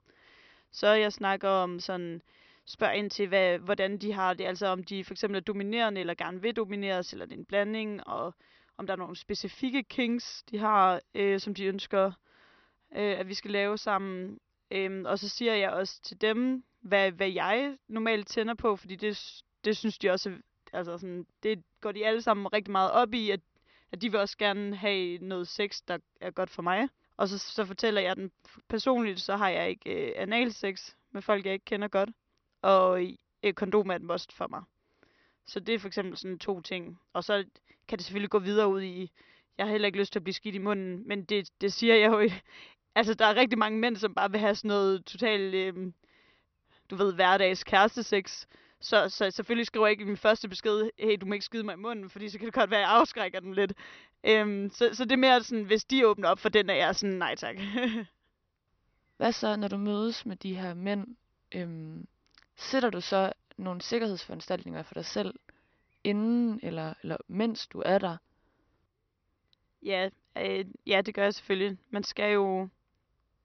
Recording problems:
high frequencies cut off; noticeable; nothing above 6 kHz

